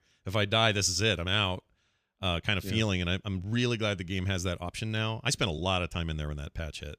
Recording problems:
uneven, jittery; slightly; from 1.5 to 6 s

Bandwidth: 15 kHz